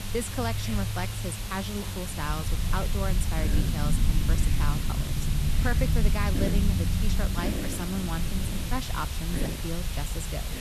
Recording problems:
hiss; loud; throughout; 2 dB below the speech
low rumble; loud; throughout; 8 dB below the speech
background music; faint; throughout; 25 dB below the speech

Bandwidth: 13.5 kHz